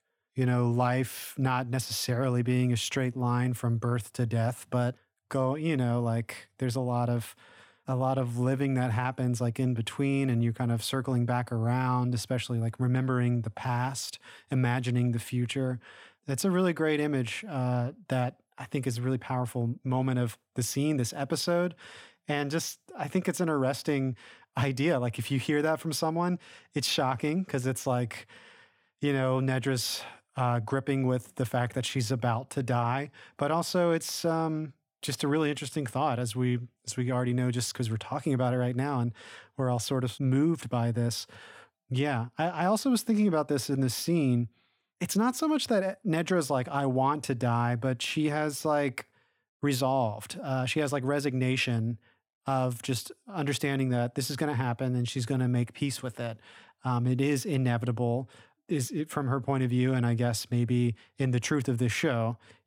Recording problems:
none

